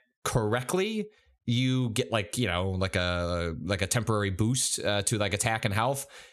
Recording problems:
squashed, flat; somewhat

